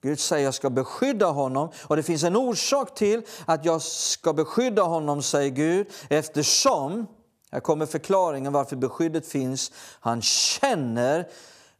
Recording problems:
none

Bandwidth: 14.5 kHz